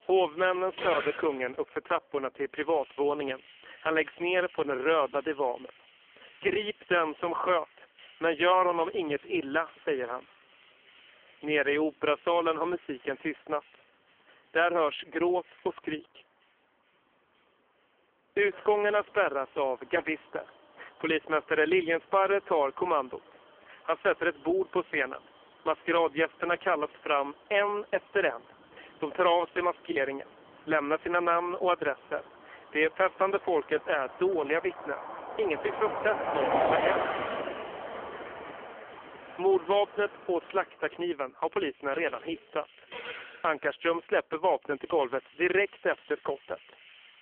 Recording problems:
phone-call audio; poor line; nothing above 3.5 kHz
traffic noise; loud; throughout; 7 dB below the speech
choppy; occasionally; at 30 s; 2% of the speech affected

